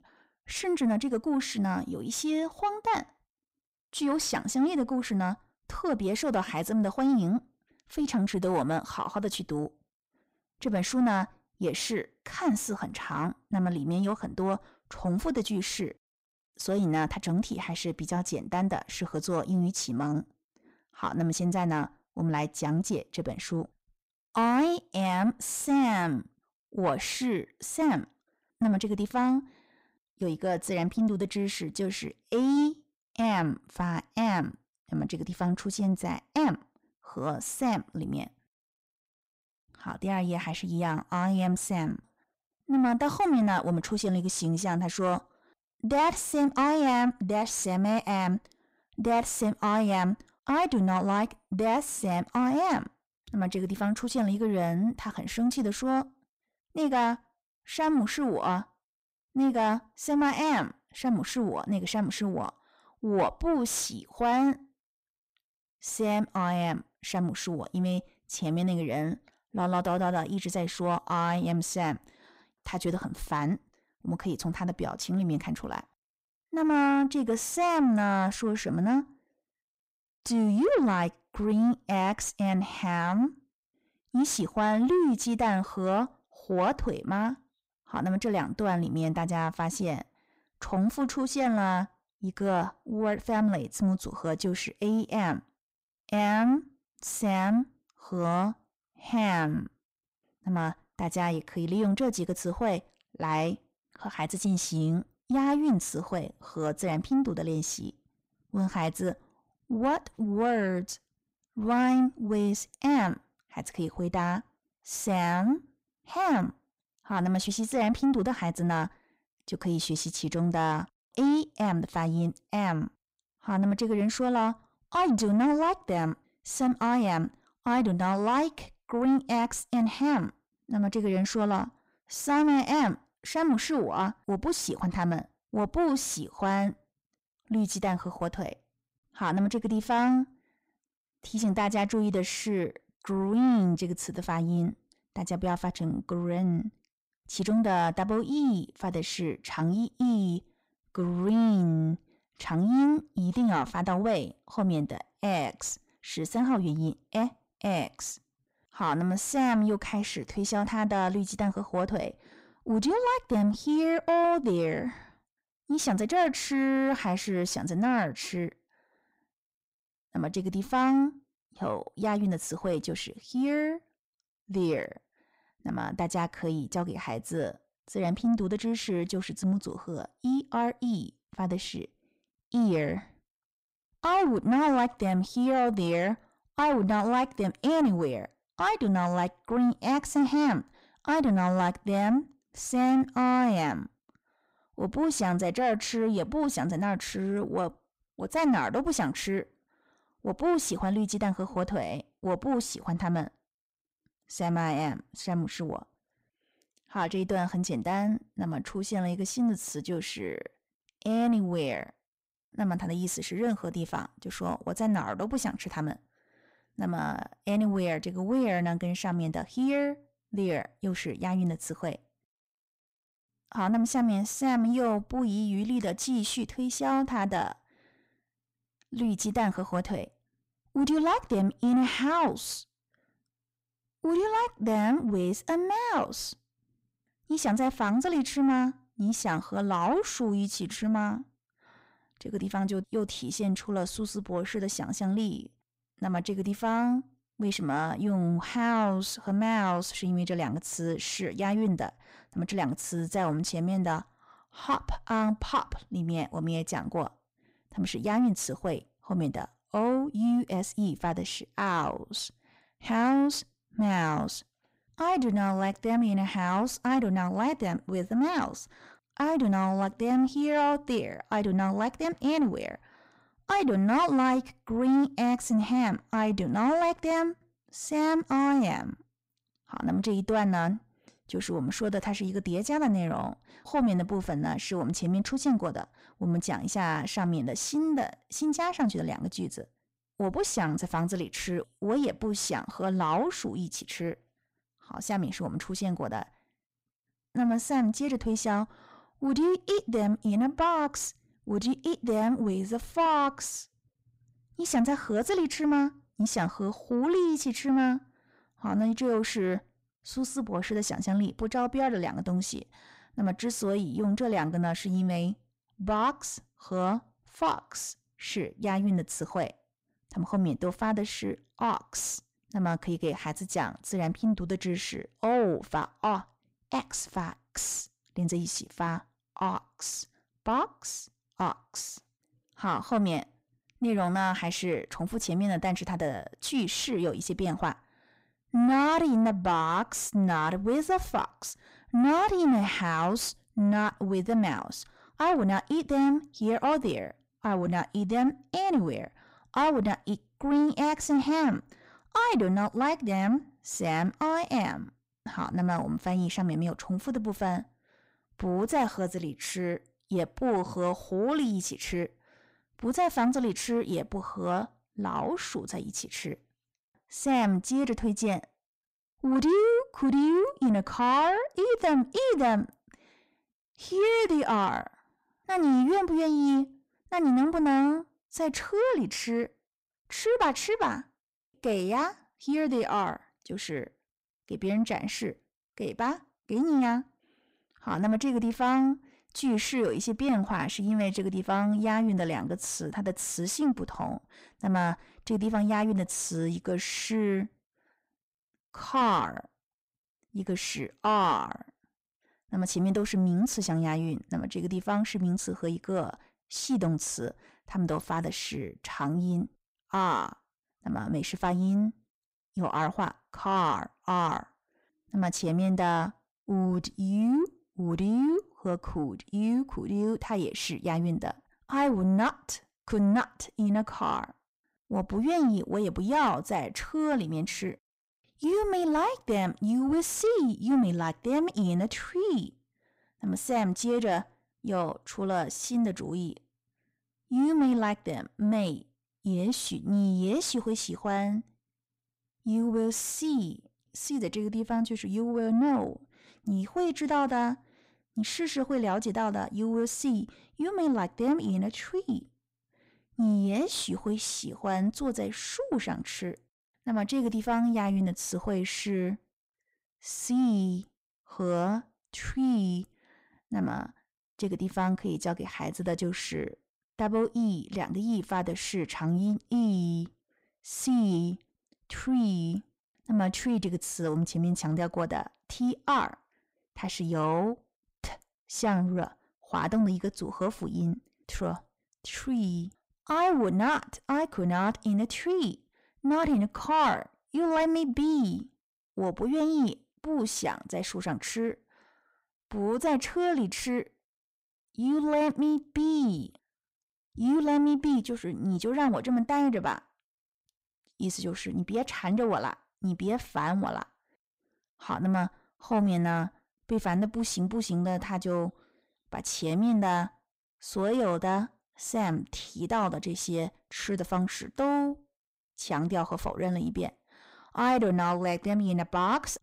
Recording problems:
distortion; slight; 10 dB below the speech

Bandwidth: 15.5 kHz